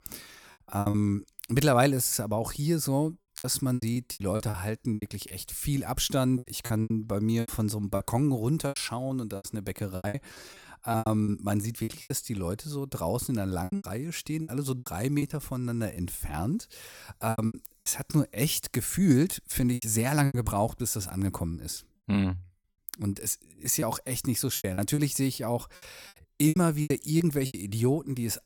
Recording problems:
choppy; very; 12% of the speech affected

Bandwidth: 18.5 kHz